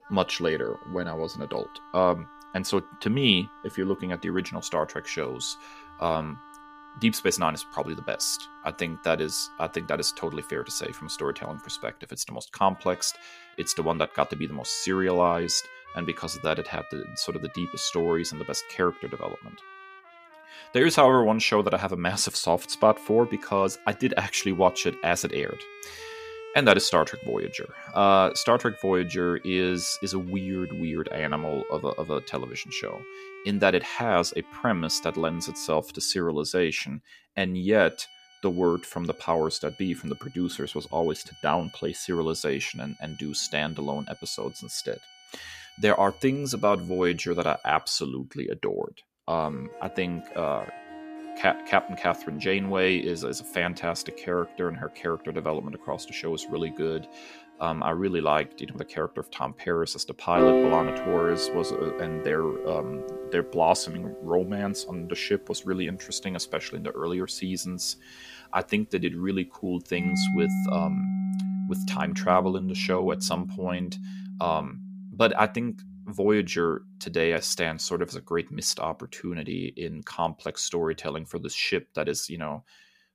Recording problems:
background music; loud; throughout; 9 dB below the speech

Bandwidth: 15 kHz